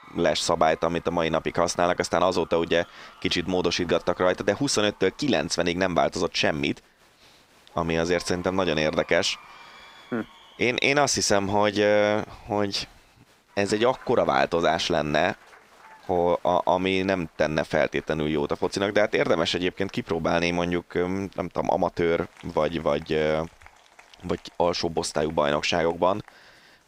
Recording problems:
crowd noise; faint; throughout; 25 dB below the speech

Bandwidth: 15.5 kHz